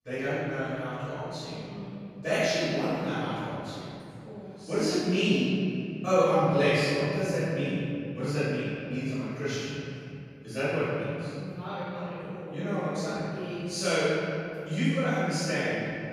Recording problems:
room echo; strong; dies away in 2.9 s
off-mic speech; far

